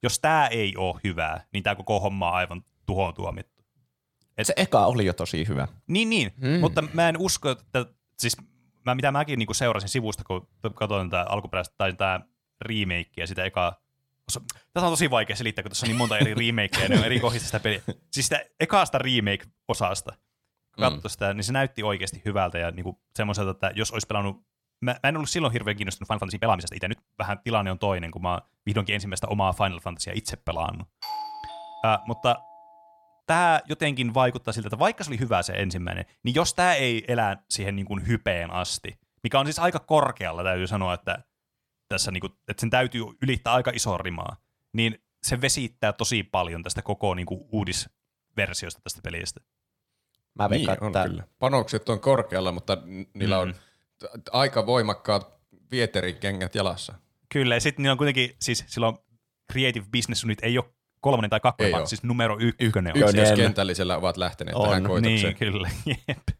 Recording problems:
uneven, jittery; strongly; from 9 s to 1:02
doorbell; noticeable; from 31 to 33 s; peak 8 dB below the speech

